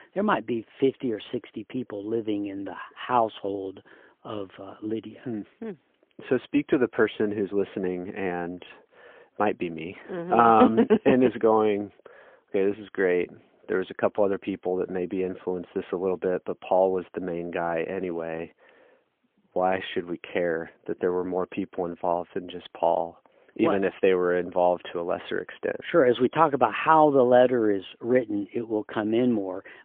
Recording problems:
phone-call audio; poor line; nothing above 3.5 kHz

